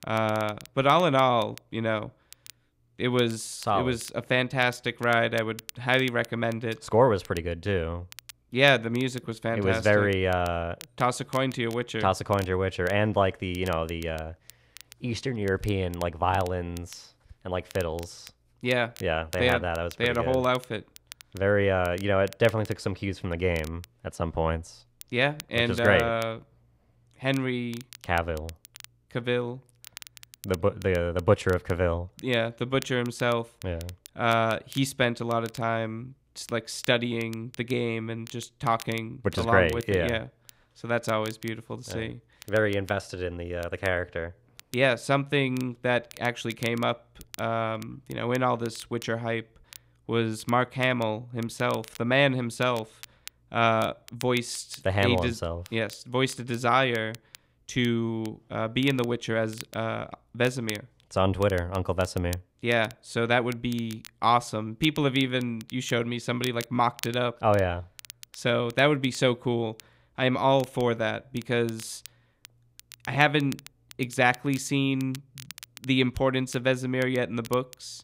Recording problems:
crackle, like an old record; faint; 20 dB below the speech

